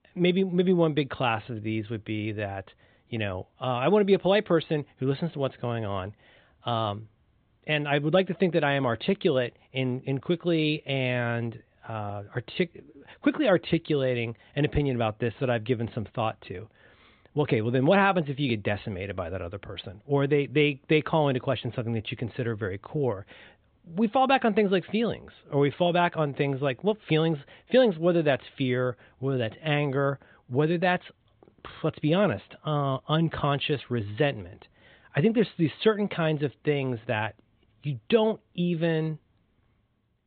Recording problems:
high frequencies cut off; severe; nothing above 4 kHz

